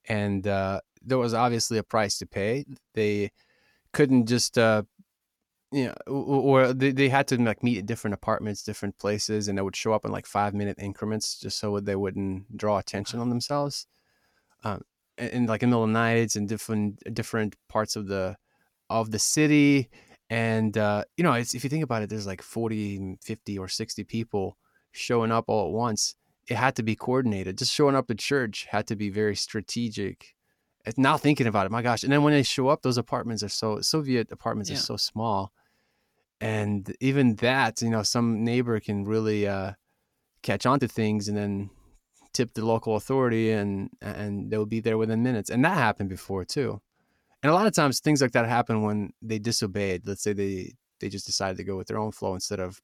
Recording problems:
uneven, jittery; slightly; from 8.5 to 50 s

